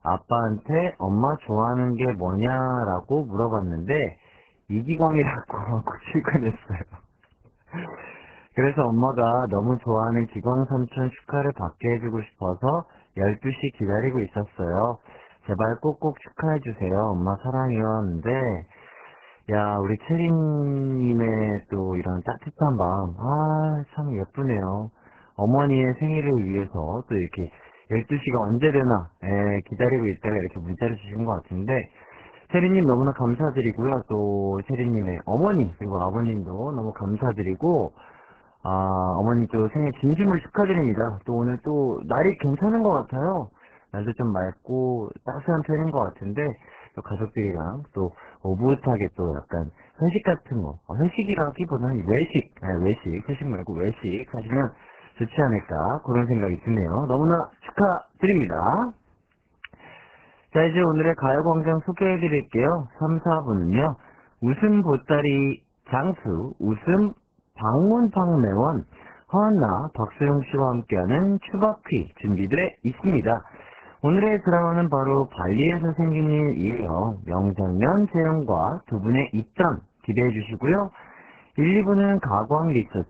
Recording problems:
garbled, watery; badly

